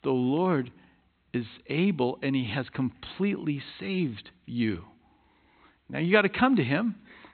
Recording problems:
high frequencies cut off; severe; nothing above 4 kHz

